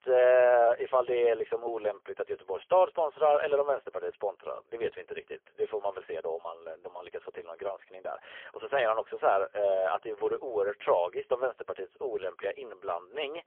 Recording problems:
phone-call audio; poor line; nothing above 3.5 kHz

